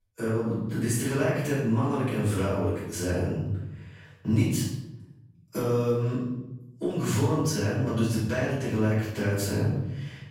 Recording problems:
off-mic speech; far
room echo; noticeable; dies away in 1 s

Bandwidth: 16.5 kHz